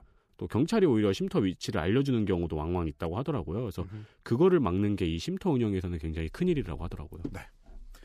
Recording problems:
none

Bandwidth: 15 kHz